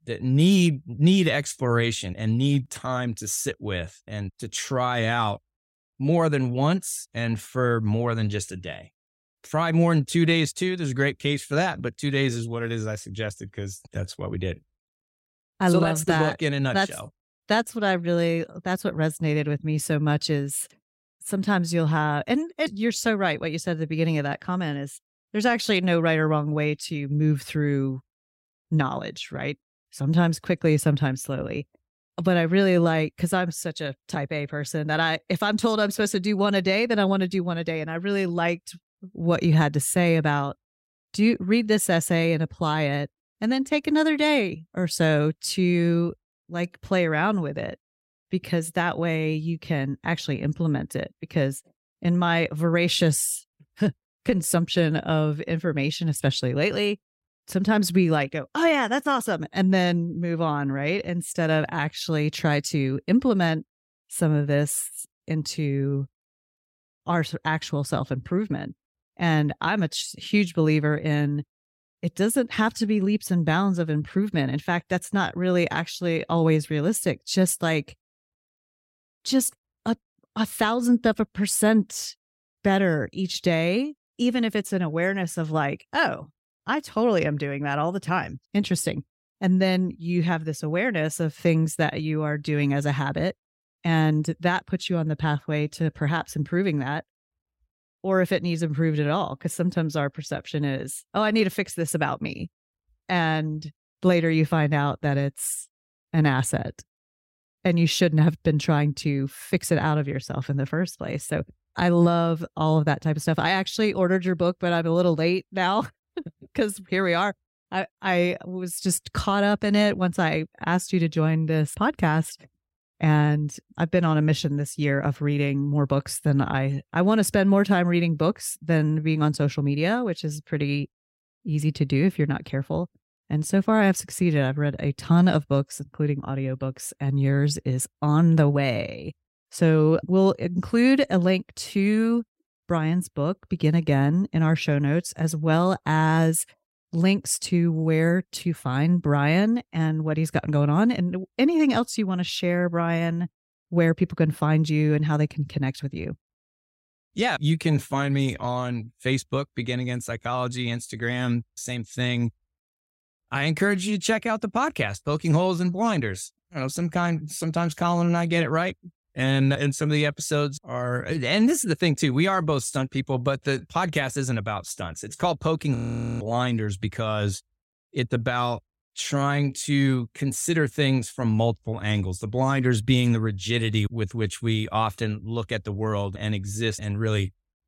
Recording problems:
audio freezing; at 2:56

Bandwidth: 16 kHz